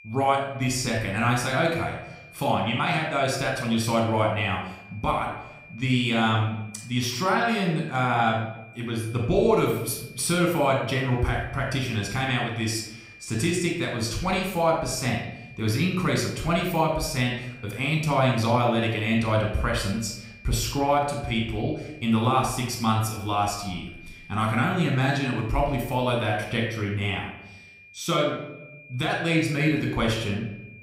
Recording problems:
room echo; noticeable; dies away in 0.7 s
off-mic speech; somewhat distant
high-pitched whine; faint; throughout; 2.5 kHz, 20 dB below the speech

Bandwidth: 15.5 kHz